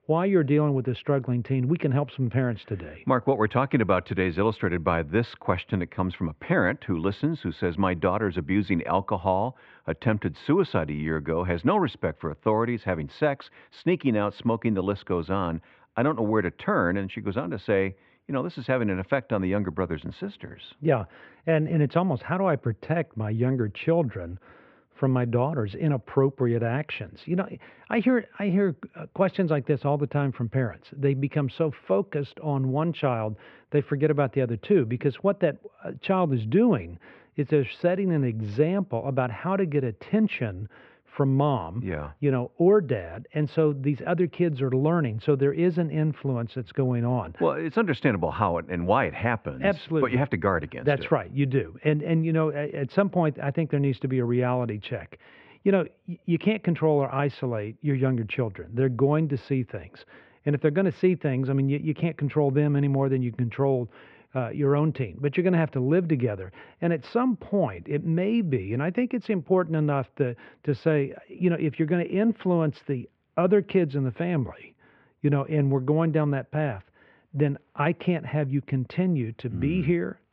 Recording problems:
muffled; very; fading above 2.5 kHz

